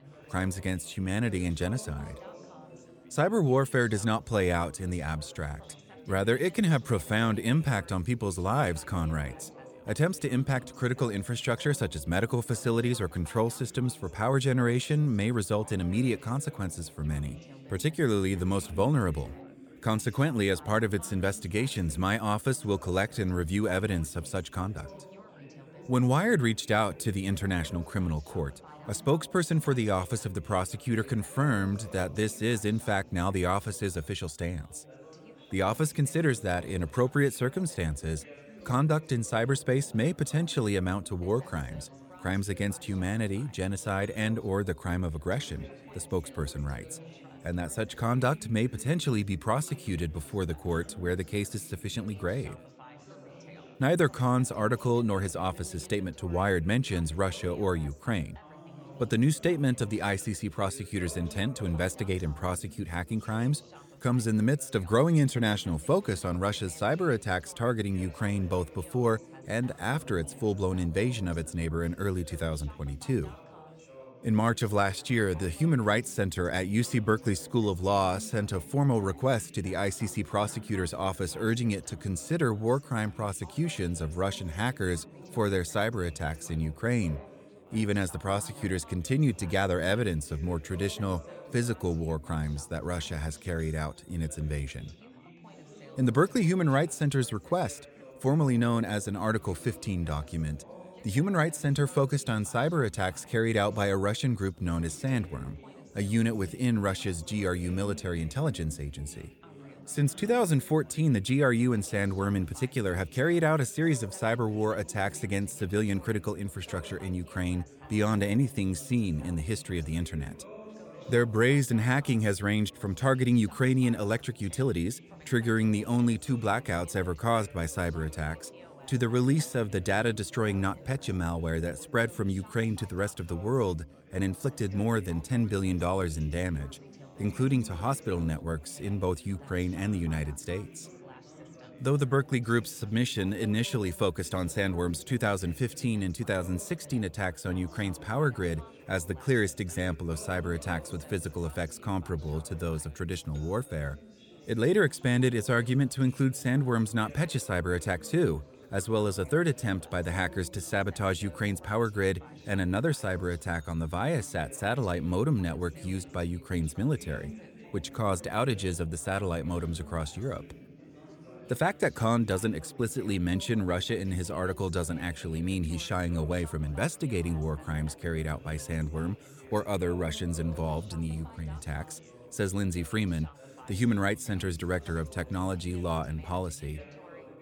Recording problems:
background chatter; noticeable; throughout; 4 voices, 20 dB below the speech

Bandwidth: 18.5 kHz